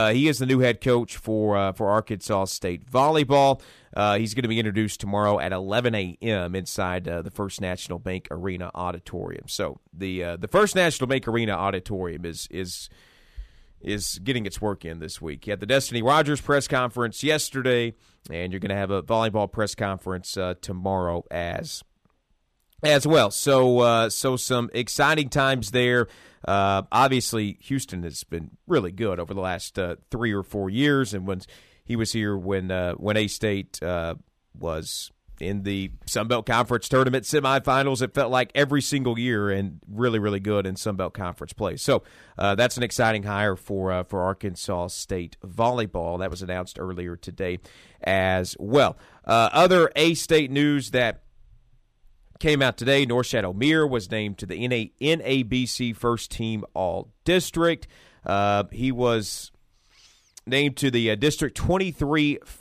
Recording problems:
abrupt cut into speech; at the start

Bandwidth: 14.5 kHz